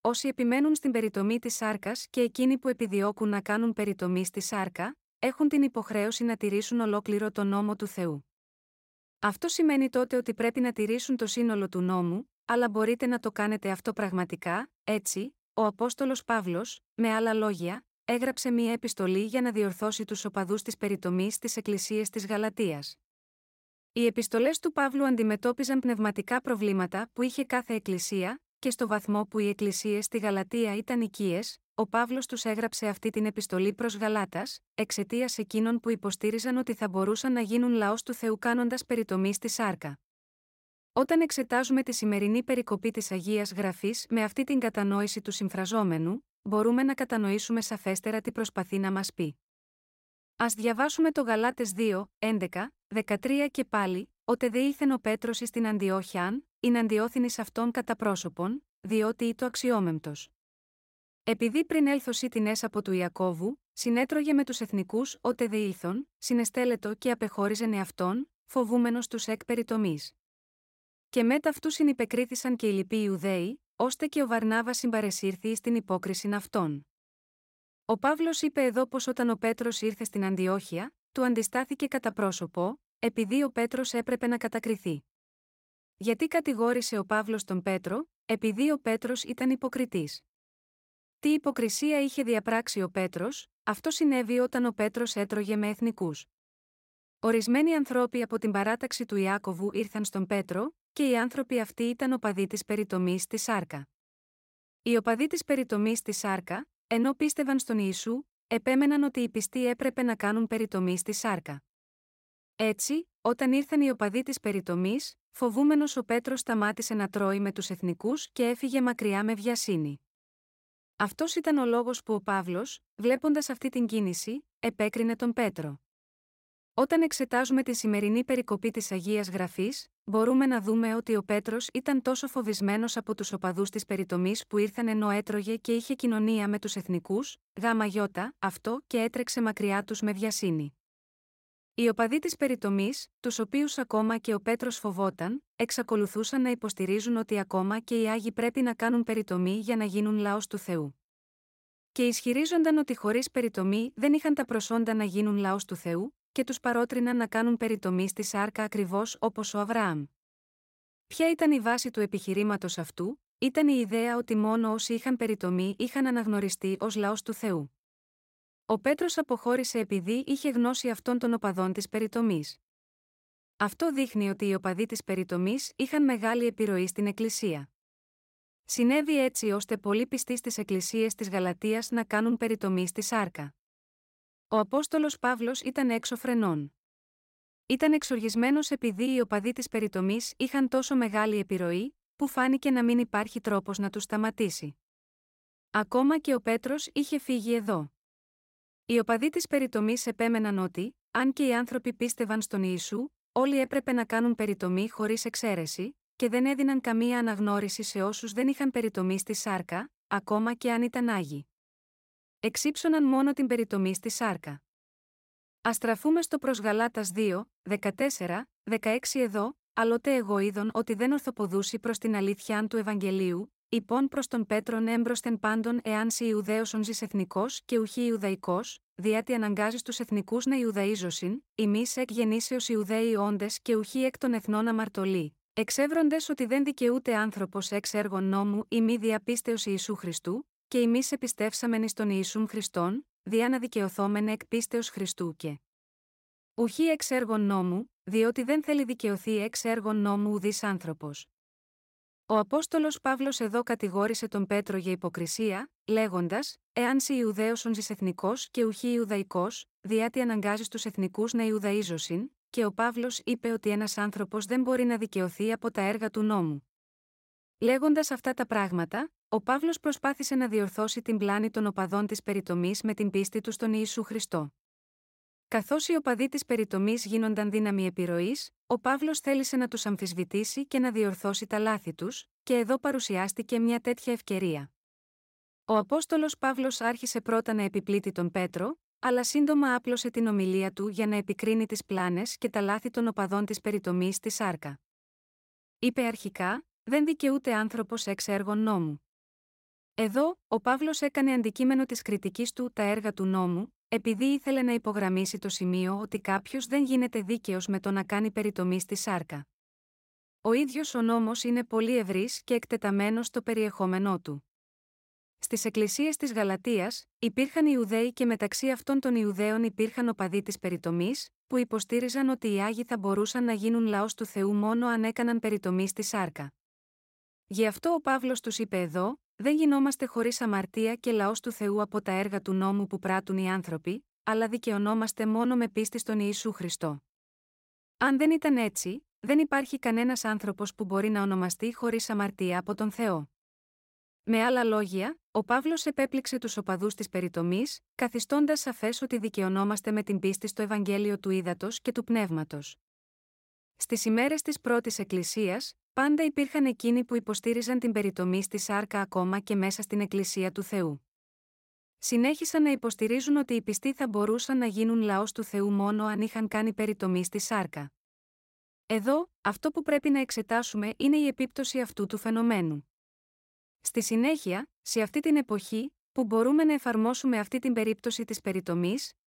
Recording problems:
none

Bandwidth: 16 kHz